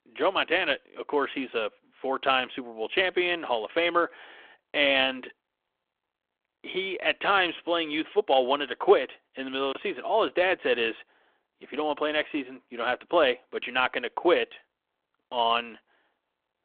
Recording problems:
phone-call audio; nothing above 3.5 kHz

